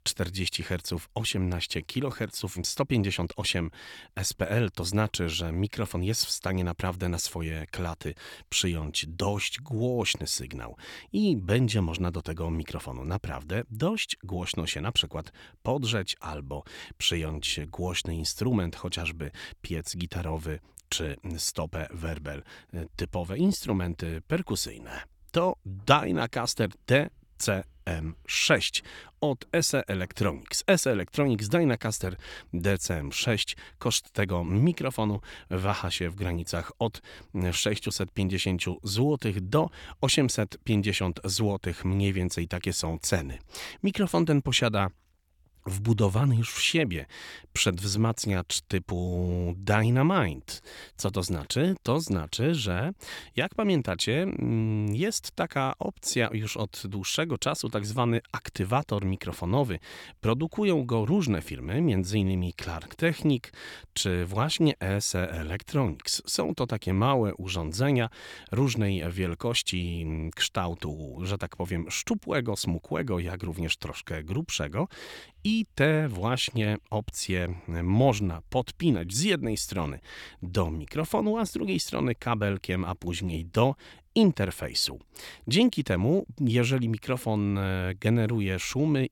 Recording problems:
none

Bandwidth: 18 kHz